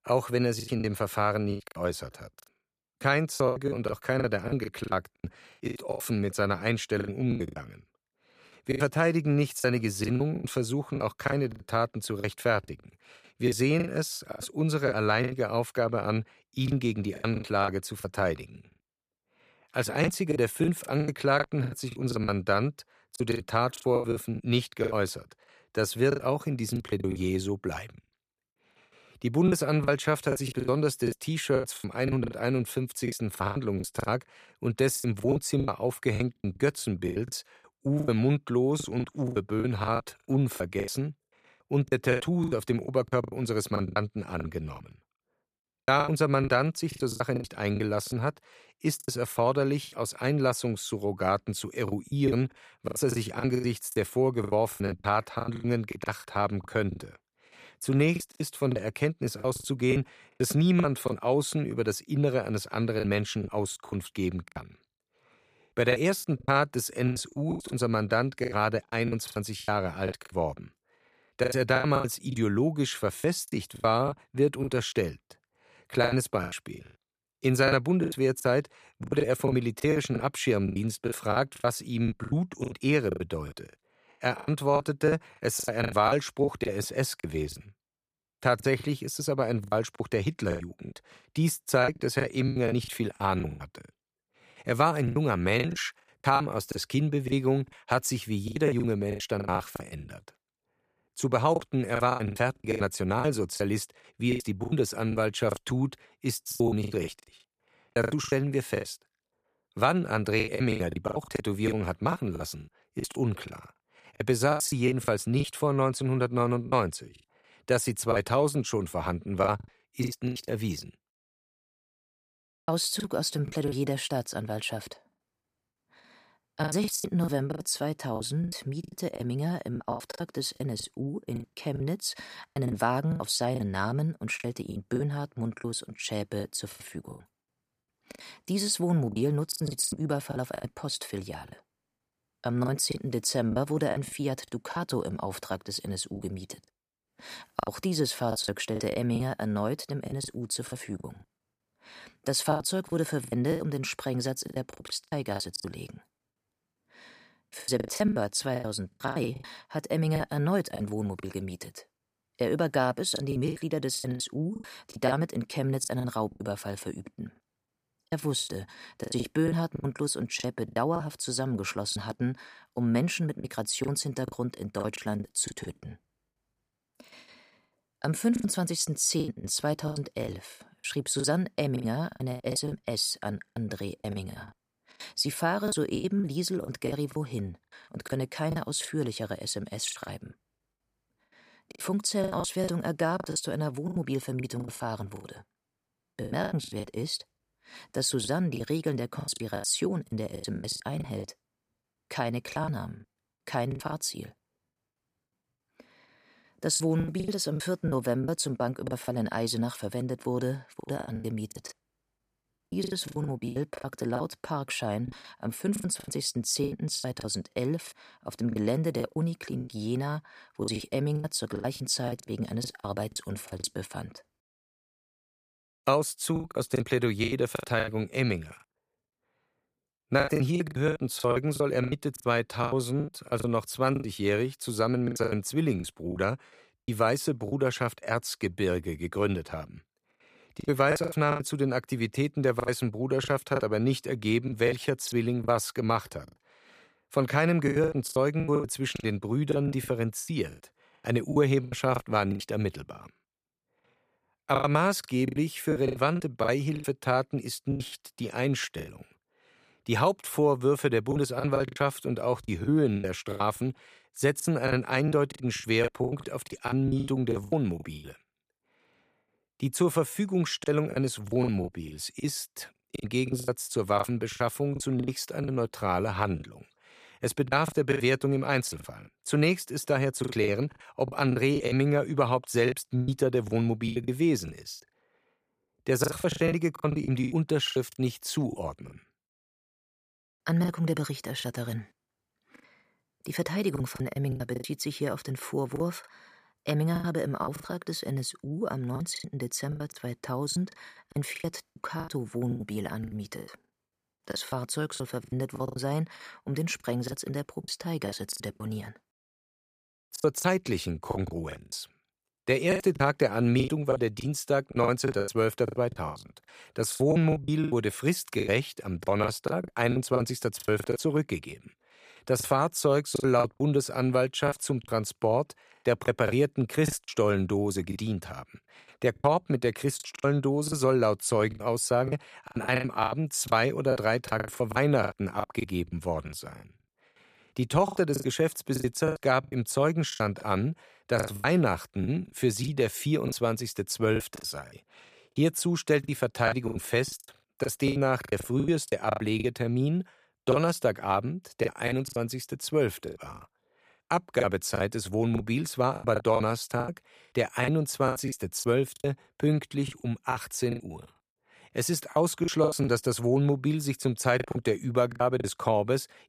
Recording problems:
choppy; very; 15% of the speech affected

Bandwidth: 15 kHz